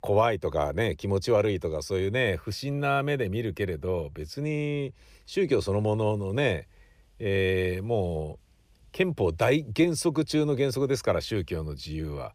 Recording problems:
none

